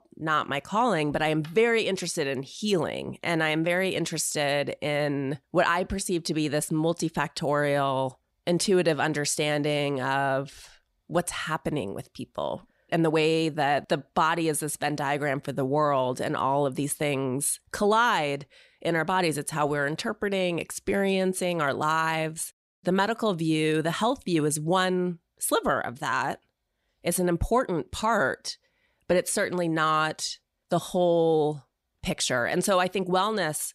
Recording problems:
none

